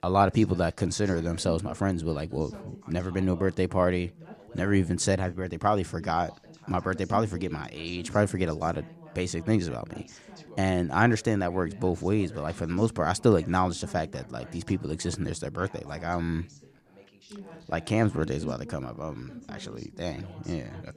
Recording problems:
background chatter; noticeable; throughout; 2 voices, 20 dB below the speech

